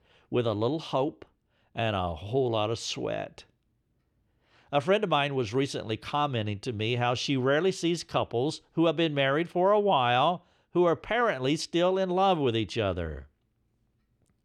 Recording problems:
muffled; slightly; fading above 3.5 kHz

